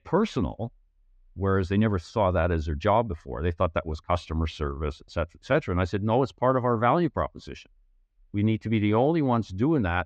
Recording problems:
muffled; slightly; fading above 3.5 kHz

